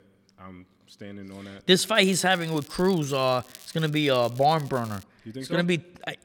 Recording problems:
crackling; faint; from 2 to 5 s; 20 dB below the speech

